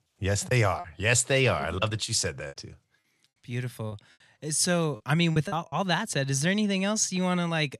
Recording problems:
choppy; very; at 1 s, from 2.5 to 4 s and at 5 s; 8% of the speech affected

